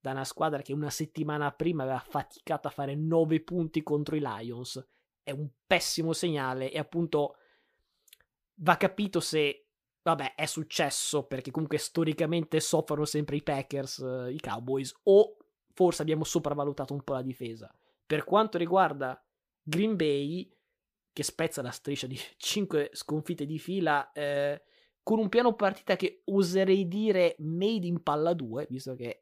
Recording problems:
none

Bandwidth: 15 kHz